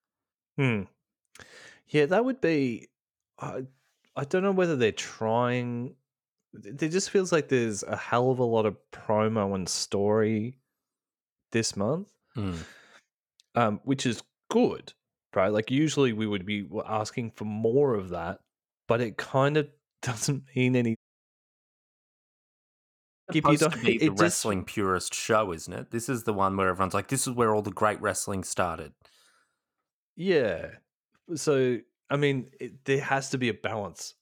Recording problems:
audio cutting out; at 21 s for 2.5 s

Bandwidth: 17.5 kHz